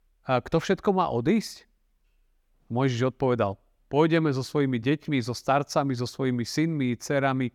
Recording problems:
none

